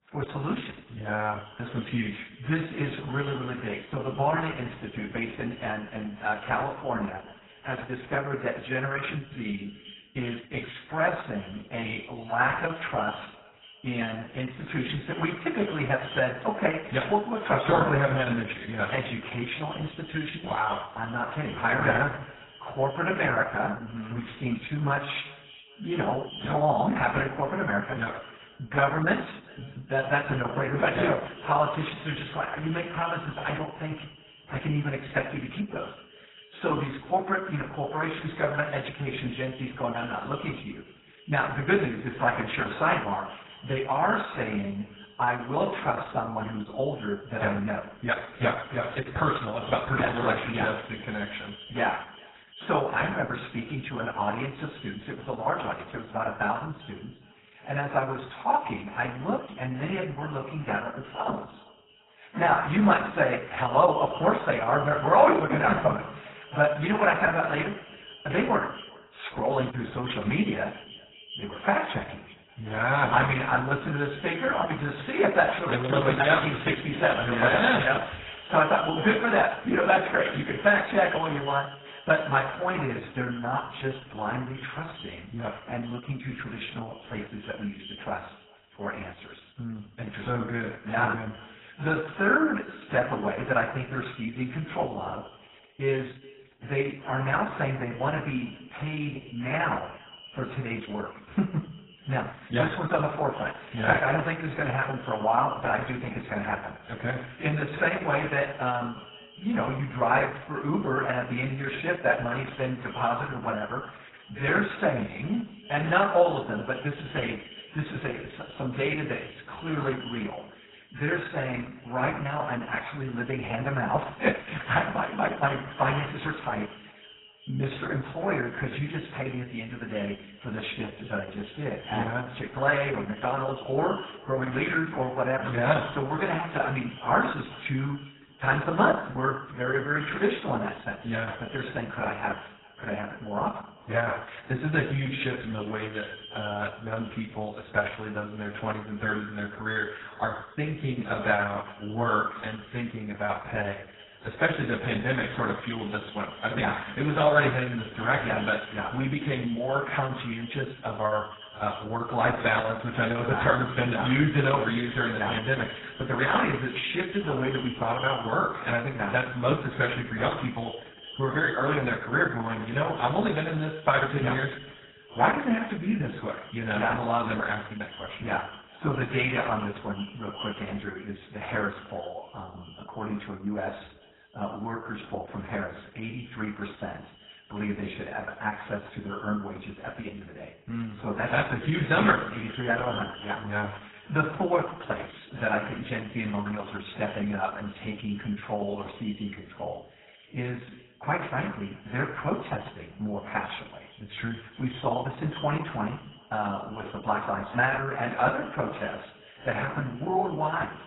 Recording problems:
garbled, watery; badly; nothing above 4 kHz
echo of what is said; faint; throughout; 400 ms later, 20 dB below the speech
room echo; slight; dies away in 0.6 s
off-mic speech; somewhat distant
muffled; very slightly; fading above 2.5 kHz

